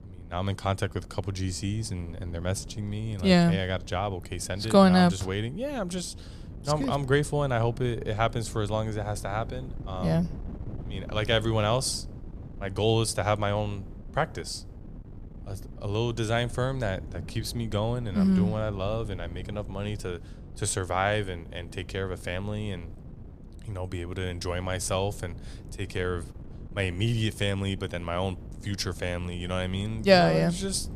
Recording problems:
wind noise on the microphone; occasional gusts; 20 dB below the speech

